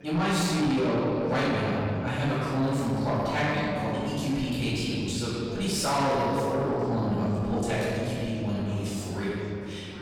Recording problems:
room echo; strong; dies away in 2.3 s
off-mic speech; far
distortion; slight; 10 dB below the speech
background chatter; noticeable; throughout; 4 voices, 20 dB below the speech

